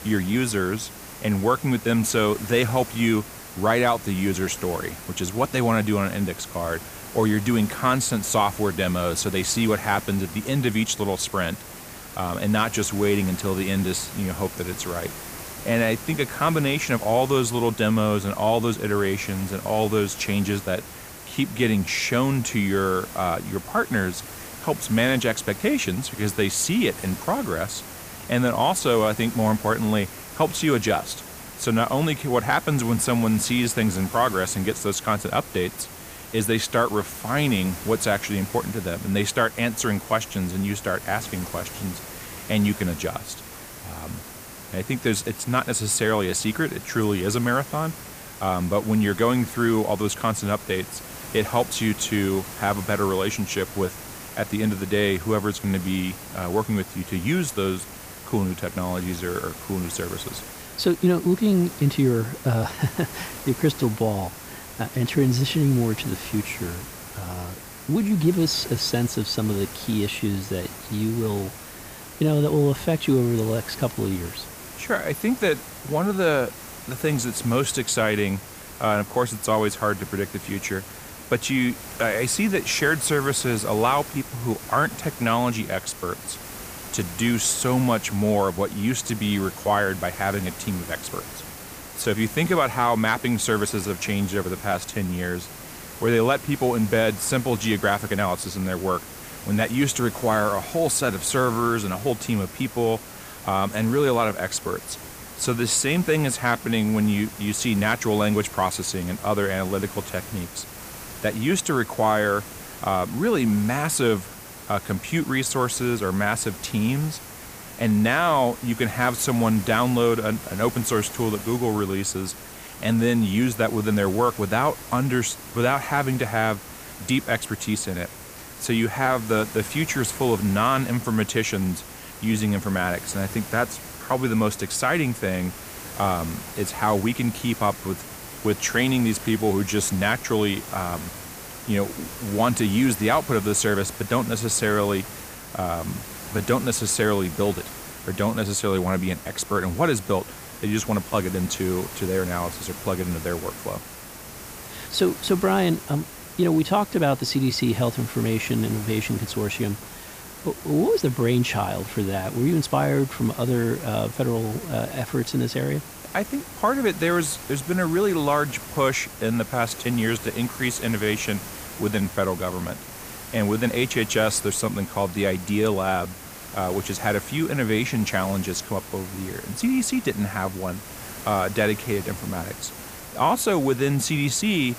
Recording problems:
hiss; noticeable; throughout; 15 dB below the speech

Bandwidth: 15 kHz